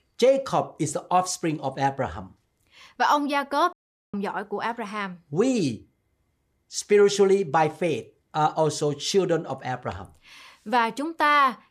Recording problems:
audio cutting out; at 3.5 s

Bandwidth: 15 kHz